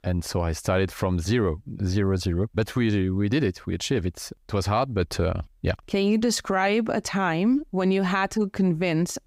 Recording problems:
none

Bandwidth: 15.5 kHz